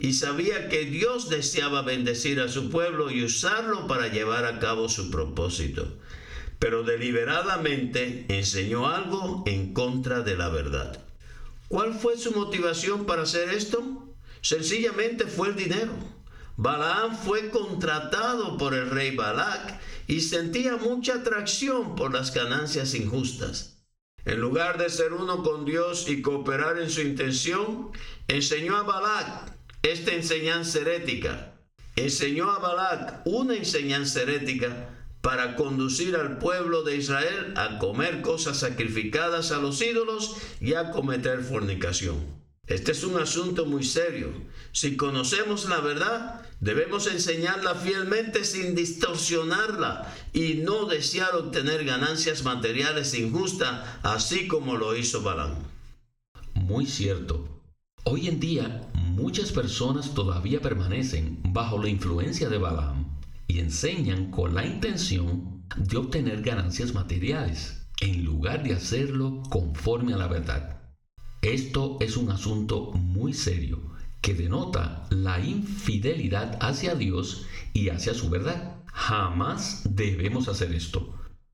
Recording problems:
room echo; very slight; dies away in 0.4 s
off-mic speech; somewhat distant
squashed, flat; somewhat

